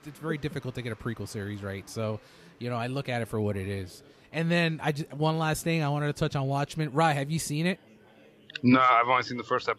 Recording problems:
murmuring crowd; faint; throughout; 25 dB below the speech

